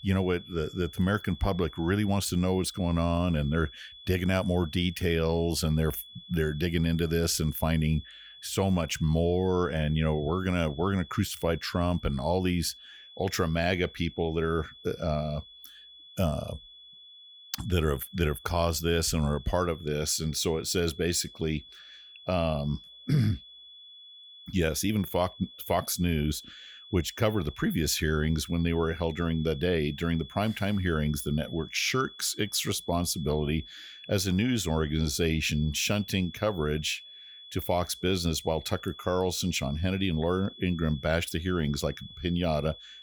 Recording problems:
high-pitched whine; noticeable; throughout; 3.5 kHz, 20 dB below the speech

